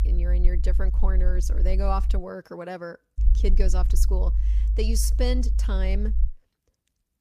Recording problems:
low rumble; noticeable; until 2 s and from 3 to 6.5 s; 15 dB below the speech

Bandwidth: 15 kHz